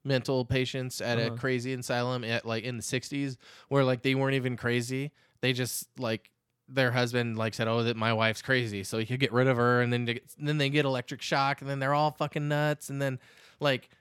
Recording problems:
none

